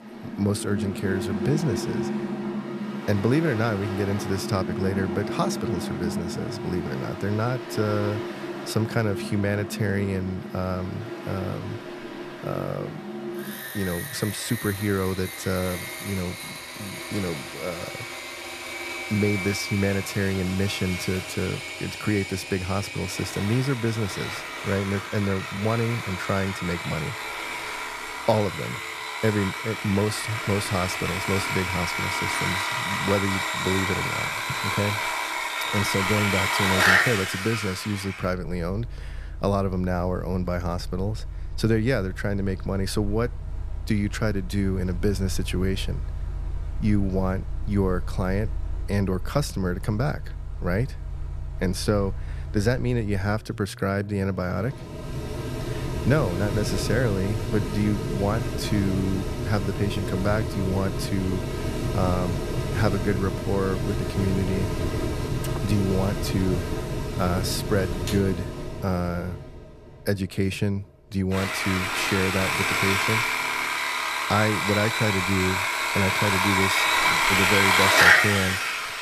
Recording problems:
machinery noise; loud; throughout; as loud as the speech

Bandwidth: 14.5 kHz